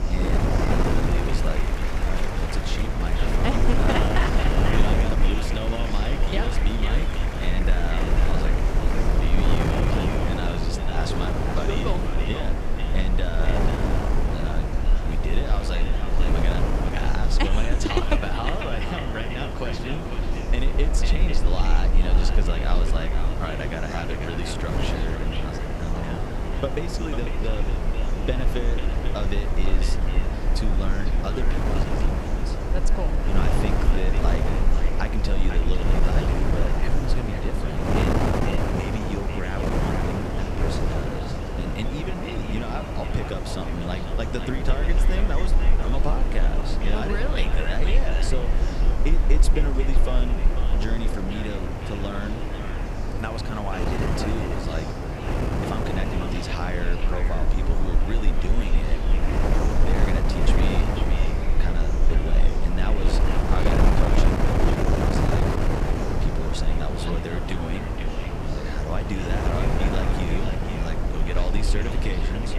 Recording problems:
echo of what is said; strong; throughout; 500 ms later, 9 dB below the speech
wind noise on the microphone; heavy; 2 dB above the speech
chatter from many people; loud; throughout; 8 dB below the speech
low rumble; faint; throughout; 20 dB below the speech

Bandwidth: 15 kHz